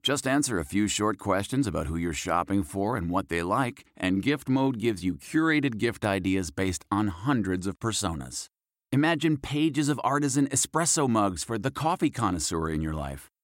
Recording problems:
none

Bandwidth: 16 kHz